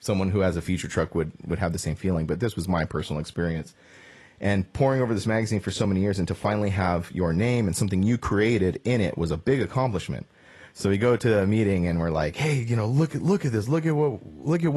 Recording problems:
garbled, watery; slightly; nothing above 11.5 kHz
abrupt cut into speech; at the end

